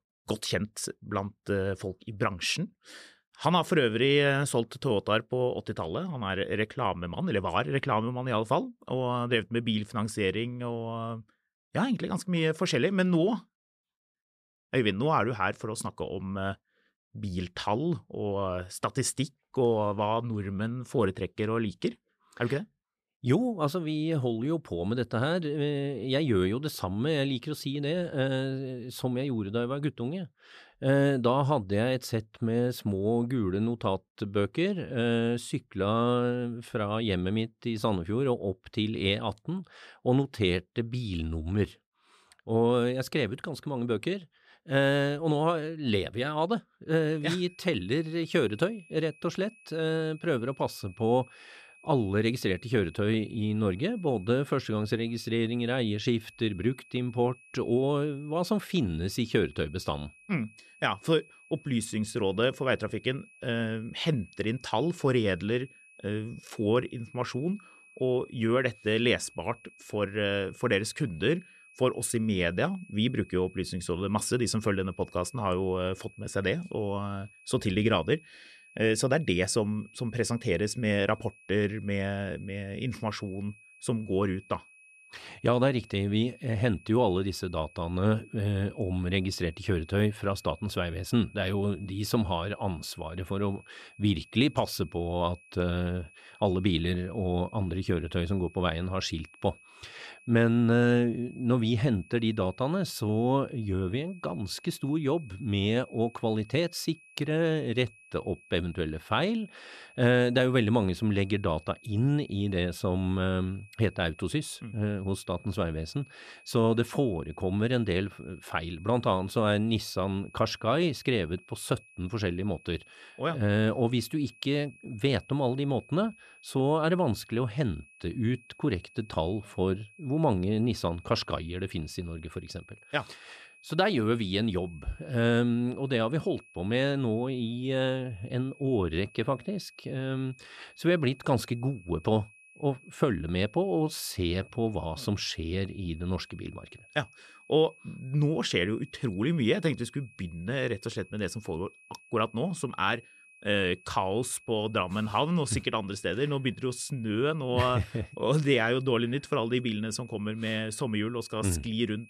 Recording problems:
high-pitched whine; faint; from 47 s on; 2.5 kHz, 25 dB below the speech

